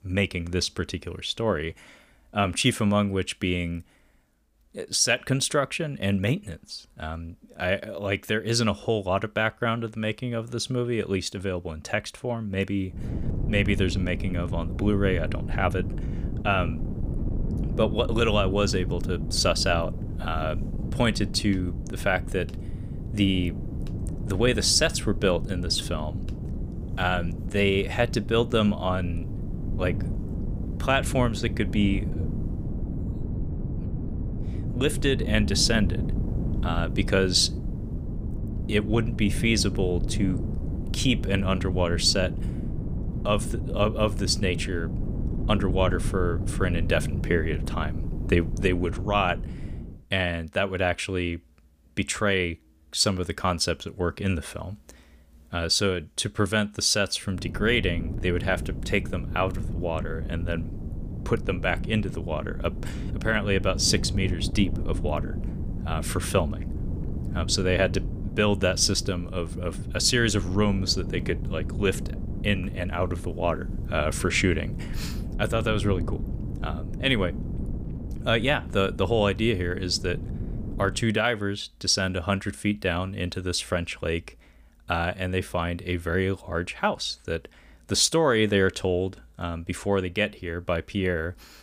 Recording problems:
wind noise on the microphone; occasional gusts; from 13 to 50 s and from 57 s to 1:21; 15 dB below the speech

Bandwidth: 15 kHz